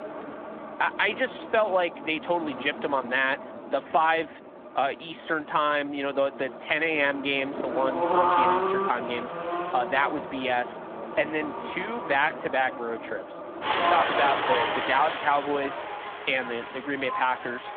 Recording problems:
phone-call audio; nothing above 3.5 kHz
traffic noise; loud; throughout; 3 dB below the speech

